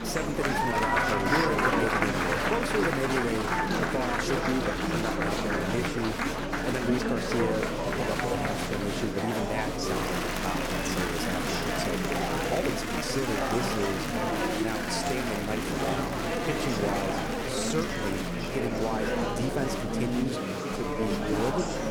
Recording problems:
murmuring crowd; very loud; throughout; 4 dB above the speech
uneven, jittery; strongly; from 0.5 to 21 s

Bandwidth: 18.5 kHz